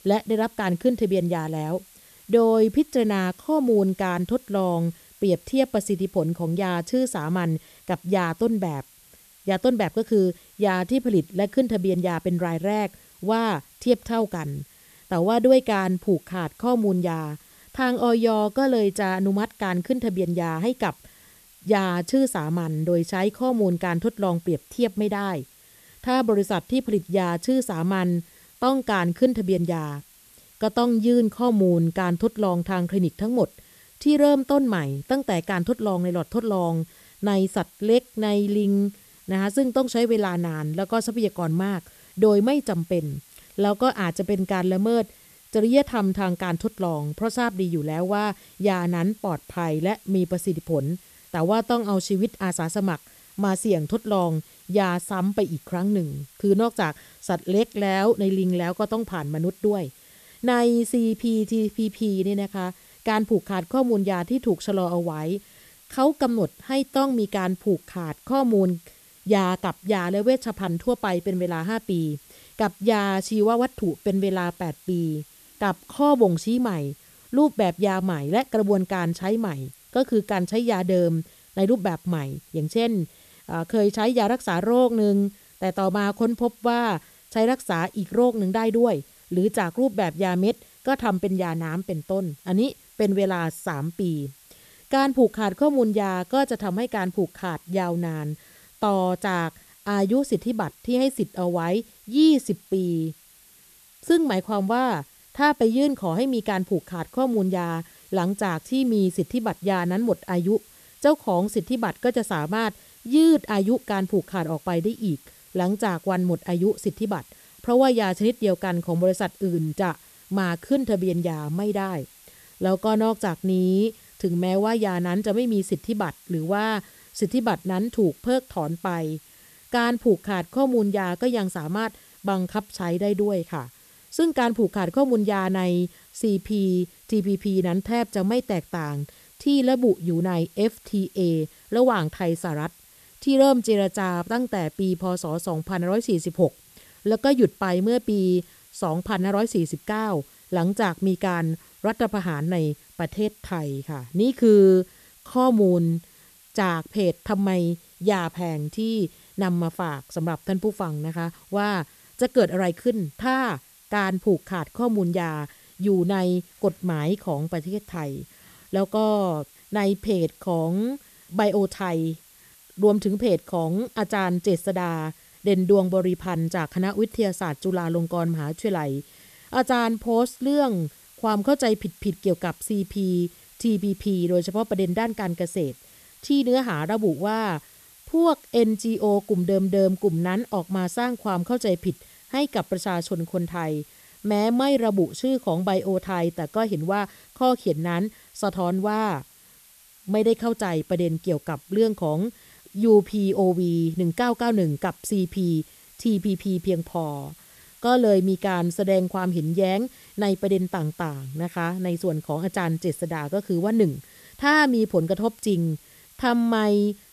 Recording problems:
hiss; faint; throughout; 25 dB below the speech

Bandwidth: 14 kHz